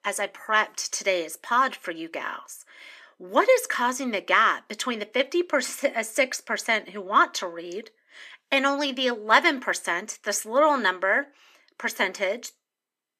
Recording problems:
thin; somewhat; fading below 300 Hz

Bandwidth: 14.5 kHz